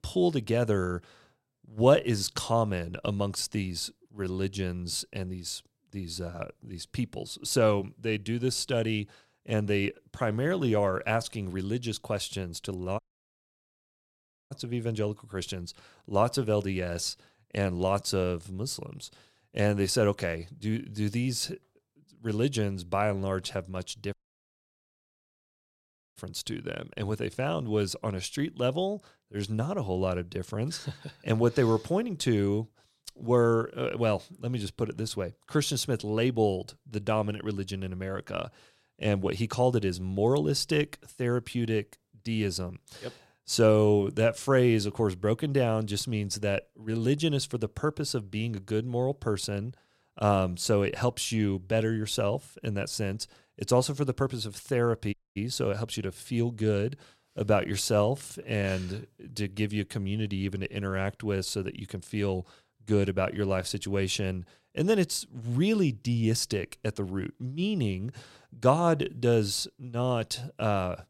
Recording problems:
audio cutting out; at 13 s for 1.5 s, at 24 s for 2 s and at 55 s

